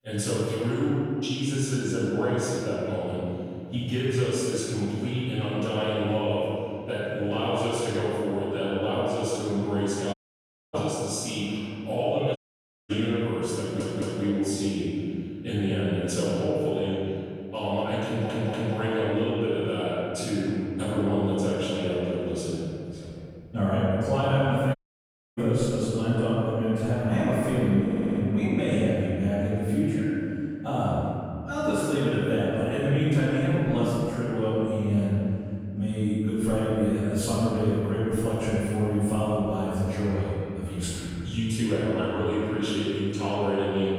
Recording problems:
room echo; strong; dies away in 2.5 s
off-mic speech; far
audio cutting out; at 10 s for 0.5 s, at 12 s for 0.5 s and at 25 s for 0.5 s
audio stuttering; at 14 s, at 18 s and at 28 s

